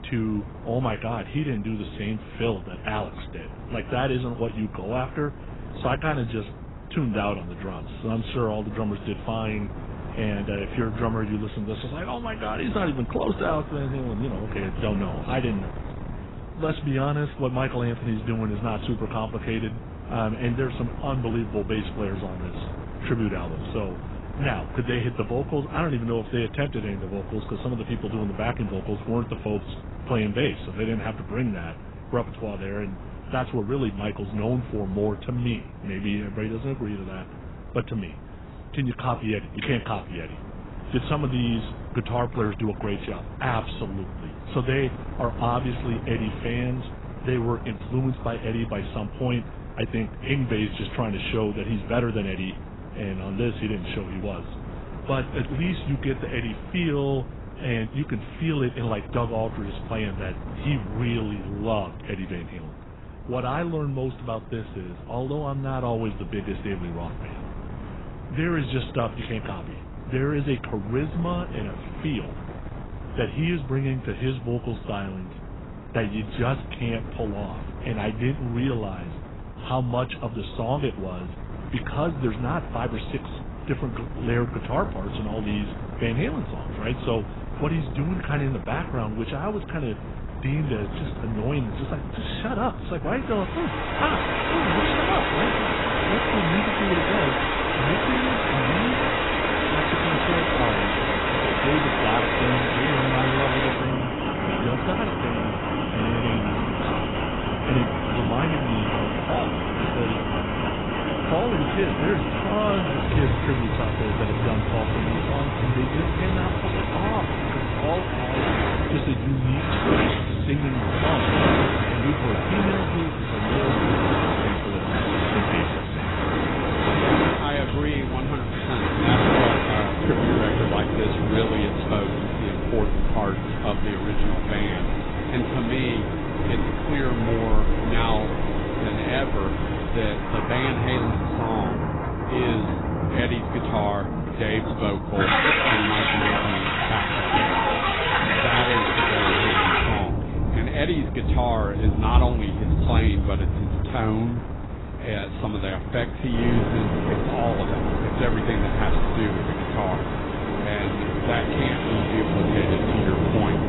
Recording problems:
garbled, watery; badly; nothing above 4 kHz
rain or running water; very loud; from 1:34 on; 4 dB above the speech
wind noise on the microphone; occasional gusts; 10 dB below the speech

